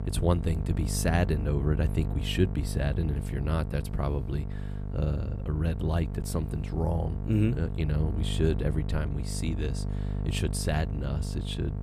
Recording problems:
electrical hum; loud; throughout; 50 Hz, 9 dB below the speech

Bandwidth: 14.5 kHz